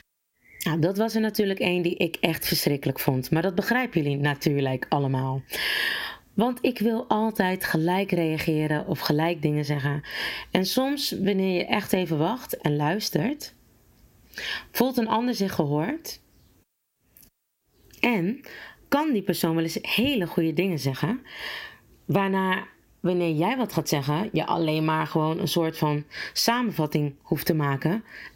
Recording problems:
squashed, flat; somewhat

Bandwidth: 16 kHz